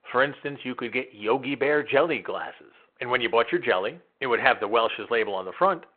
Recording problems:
phone-call audio

